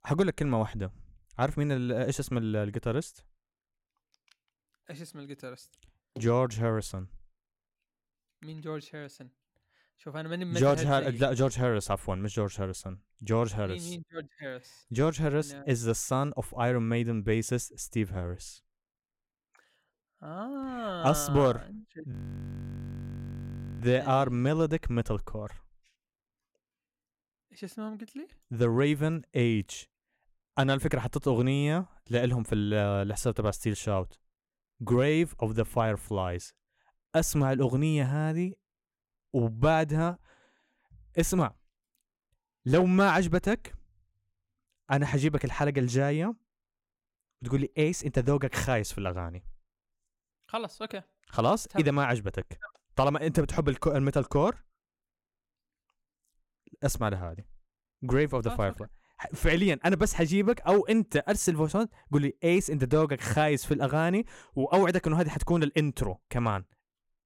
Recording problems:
audio freezing; at 22 s for 1.5 s

